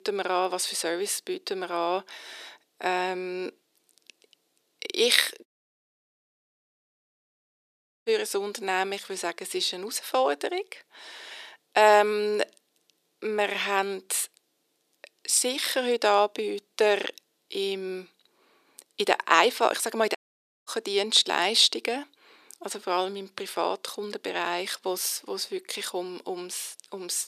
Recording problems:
thin; very; fading below 350 Hz
audio cutting out; at 5.5 s for 2.5 s and at 20 s for 0.5 s

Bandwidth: 14.5 kHz